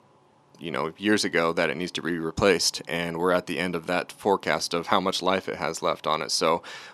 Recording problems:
thin; somewhat; fading below 250 Hz

